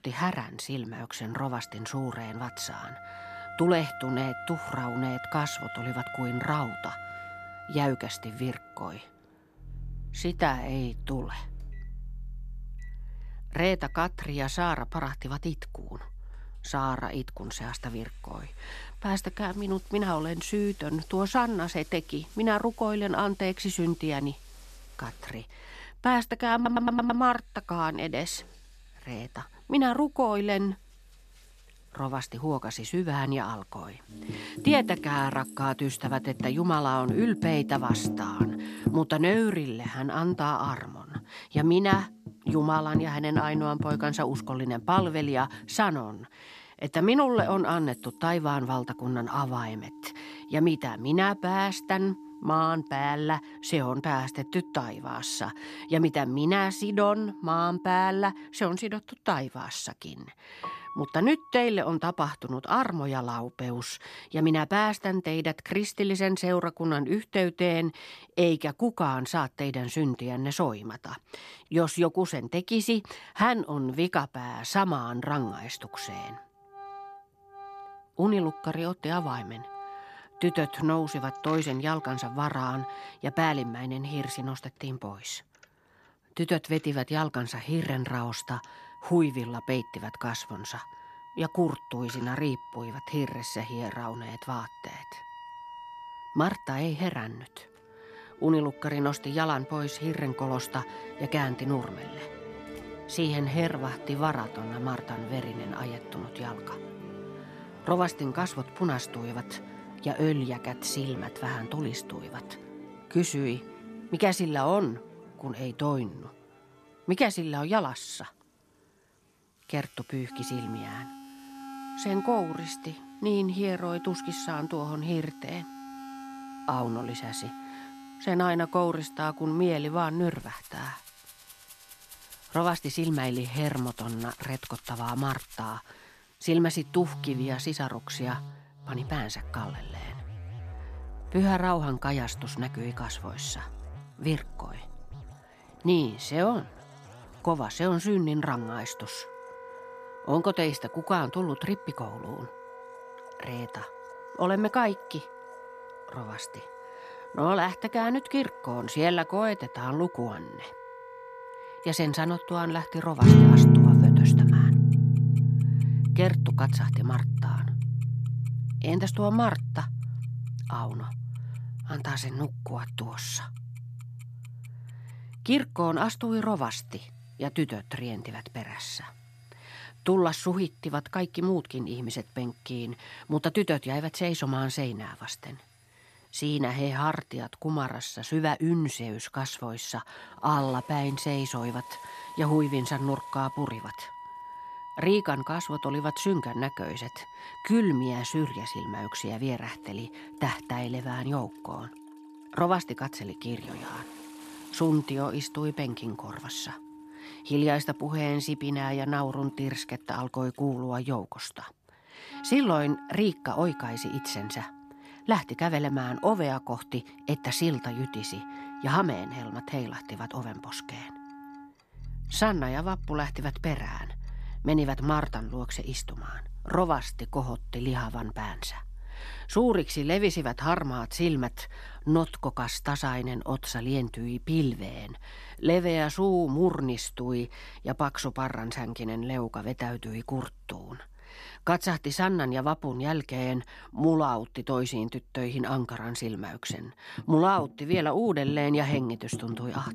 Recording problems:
background music; loud; throughout; 2 dB below the speech
household noises; faint; throughout; 30 dB below the speech
audio stuttering; at 27 s

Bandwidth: 14 kHz